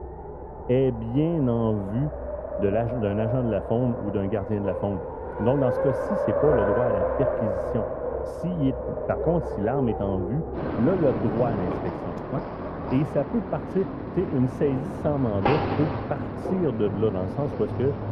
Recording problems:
muffled; very; fading above 1.5 kHz
traffic noise; loud; throughout; 3 dB below the speech

